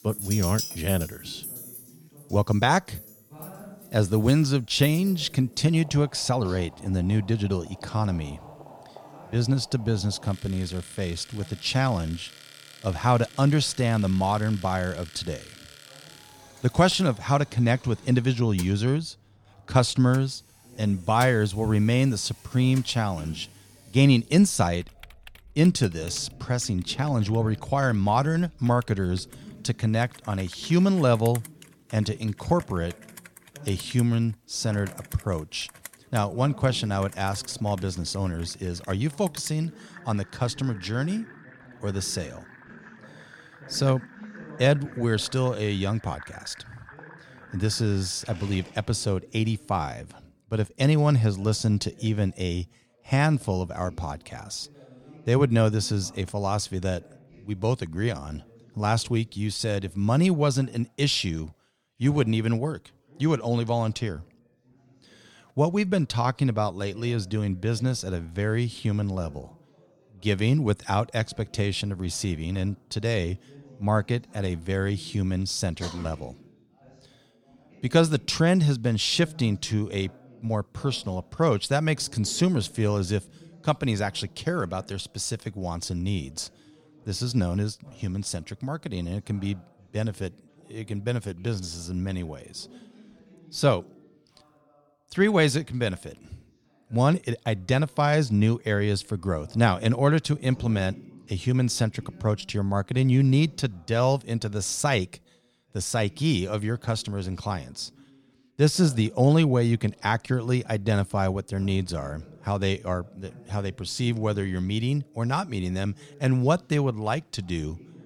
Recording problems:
household noises; noticeable; until 49 s; 20 dB below the speech
background chatter; faint; throughout; 2 voices, 25 dB below the speech

